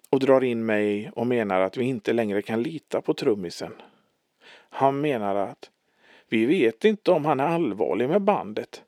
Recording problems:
thin; somewhat; fading below 350 Hz

